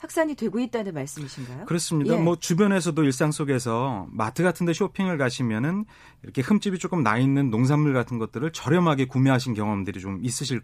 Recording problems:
none

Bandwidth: 15 kHz